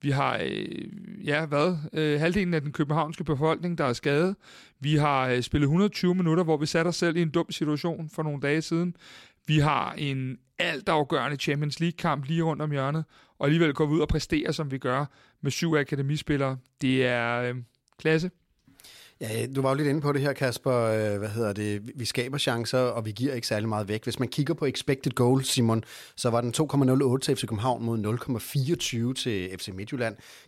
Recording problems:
none

